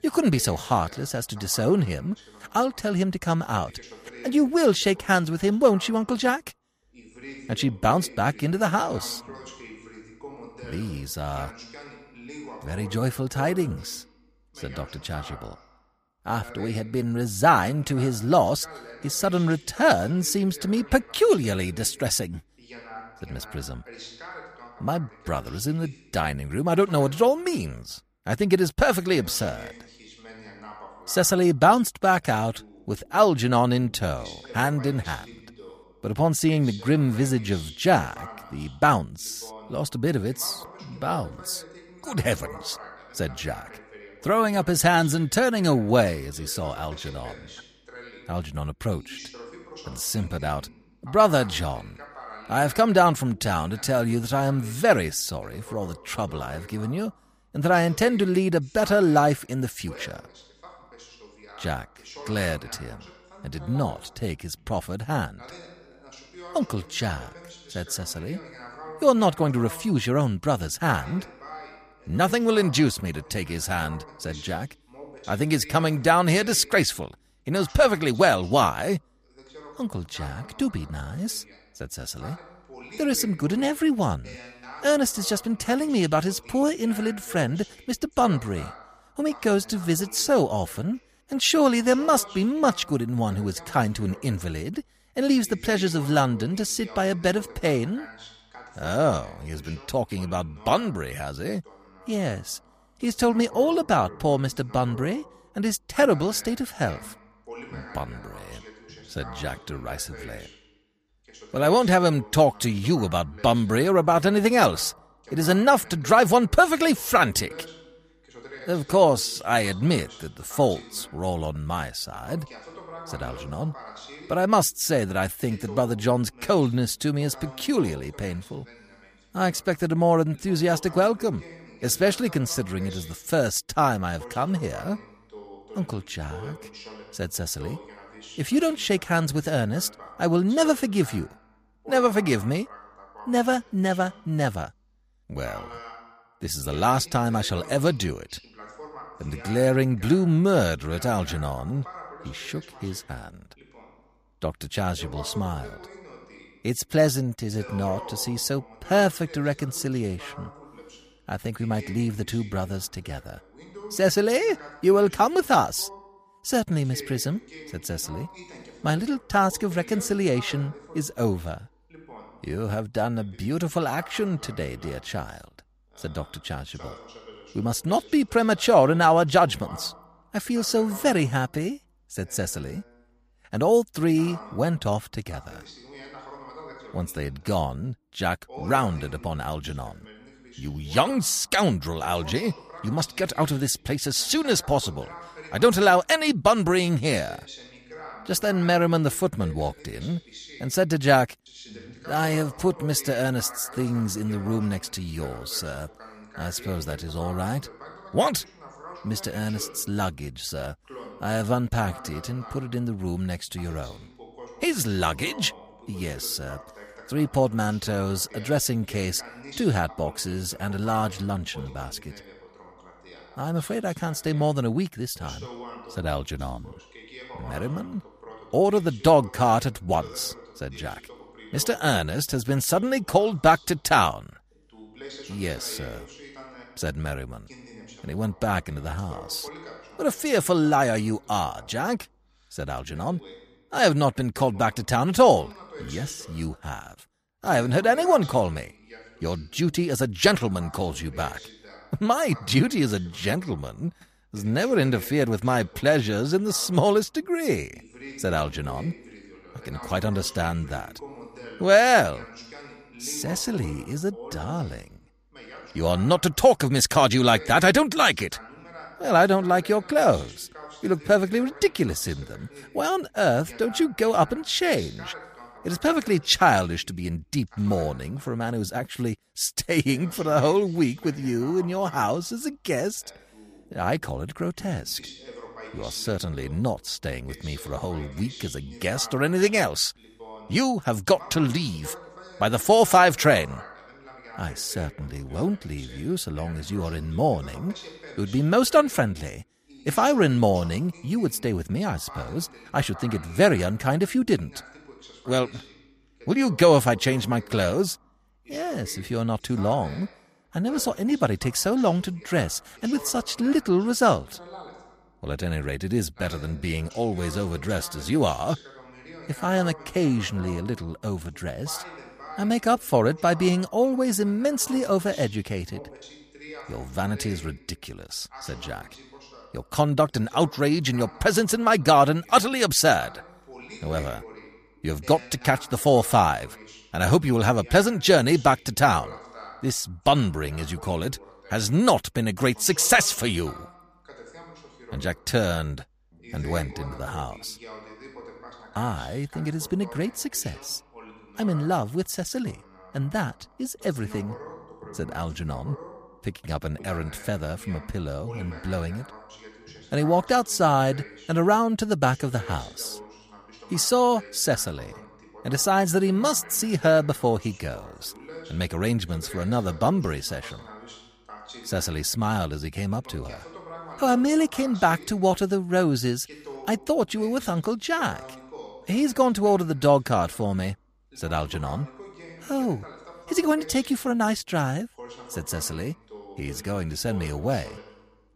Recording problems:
voice in the background; noticeable; throughout; 20 dB below the speech

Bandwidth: 15 kHz